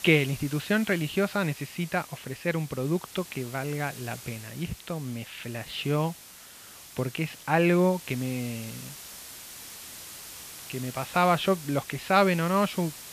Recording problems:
muffled; very slightly; fading above 3.5 kHz
thin; very slightly; fading below 950 Hz
hiss; noticeable; throughout; 15 dB below the speech

